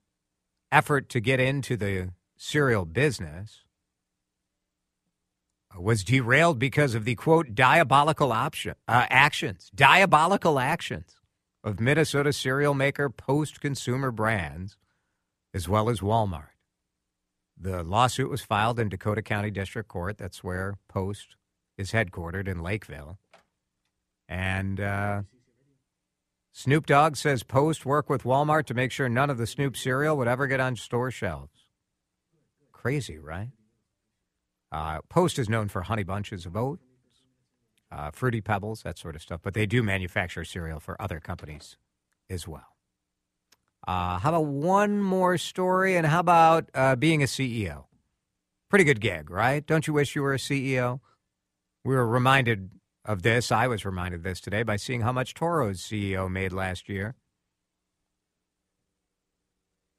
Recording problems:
none

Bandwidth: 14.5 kHz